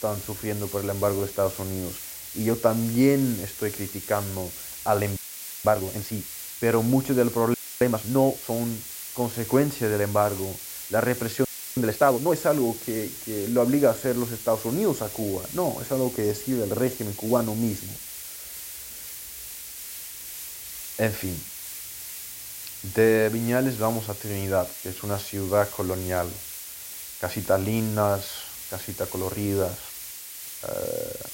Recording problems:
hiss; loud; throughout; 9 dB below the speech
audio freezing; at 5 s, at 7.5 s and at 11 s

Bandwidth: 16 kHz